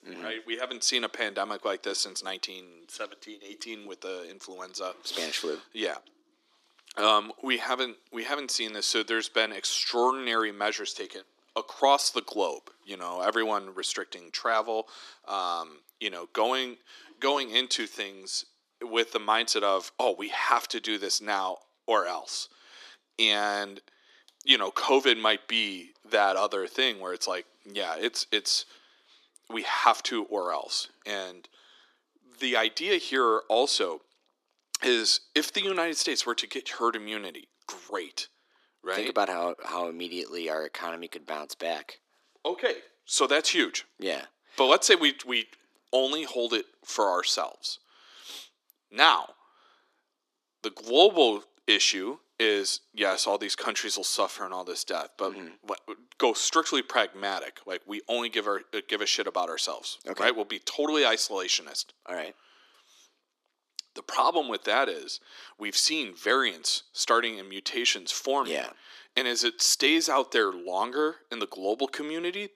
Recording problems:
thin; very; fading below 300 Hz

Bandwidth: 13.5 kHz